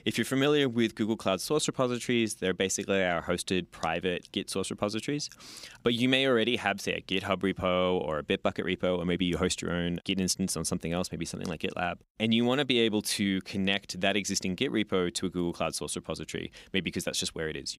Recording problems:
none

